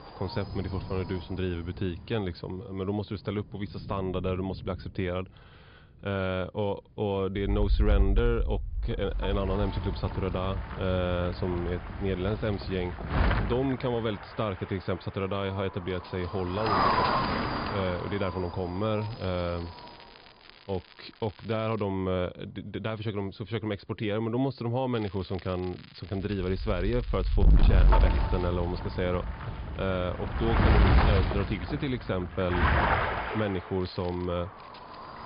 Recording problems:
high frequencies cut off; noticeable; nothing above 5 kHz
distortion; slight; 1.1% of the sound clipped
wind noise on the microphone; heavy; 1 dB above the speech
rain or running water; noticeable; throughout; 15 dB below the speech
crackling; faint; from 19 to 22 s, from 25 to 28 s and at 34 s; 20 dB below the speech

